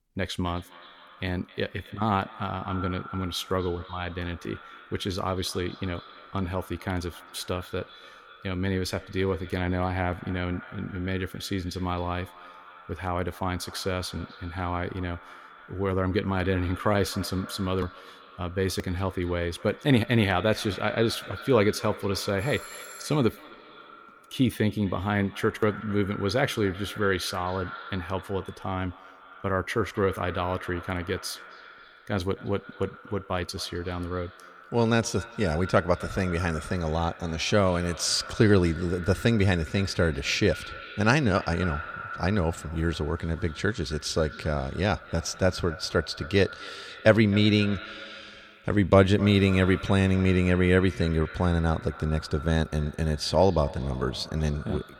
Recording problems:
echo of what is said; noticeable; throughout; 260 ms later, 15 dB below the speech
doorbell; faint; at 22 s; peak 15 dB below the speech

